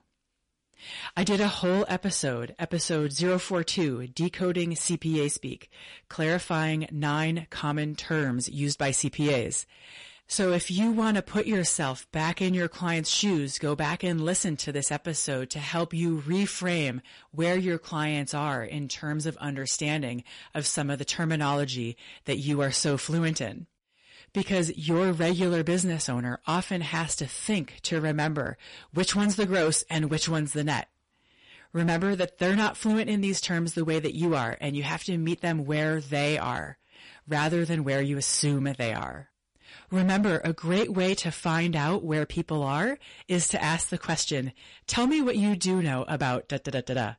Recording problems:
distortion; slight; 8% of the sound clipped
garbled, watery; slightly; nothing above 10.5 kHz

